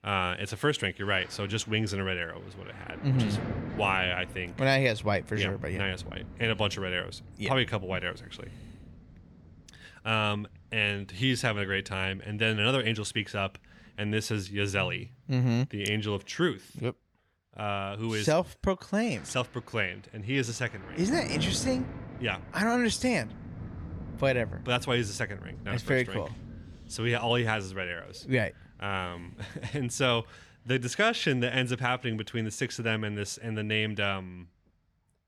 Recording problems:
rain or running water; noticeable; throughout; 15 dB below the speech

